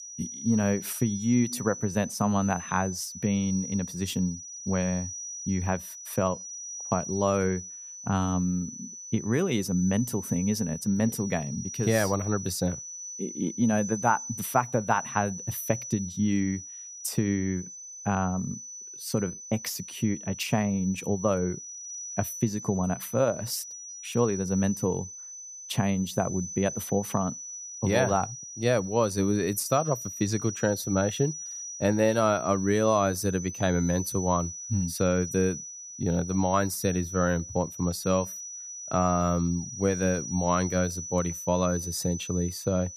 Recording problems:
high-pitched whine; loud; throughout; 6 kHz, 9 dB below the speech

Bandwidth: 15 kHz